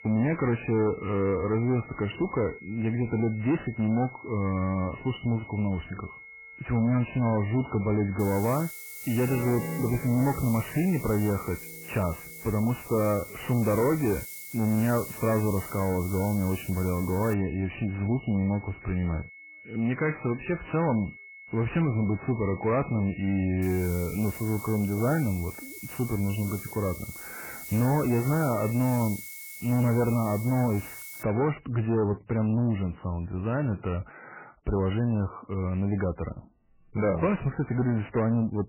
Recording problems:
garbled, watery; badly; nothing above 3 kHz
distortion; slight; 10 dB below the speech
high-pitched whine; noticeable; until 31 s; 2 kHz, 20 dB below the speech
background music; noticeable; throughout; 10 dB below the speech
hiss; noticeable; from 8 to 17 s and from 24 to 31 s; 15 dB below the speech

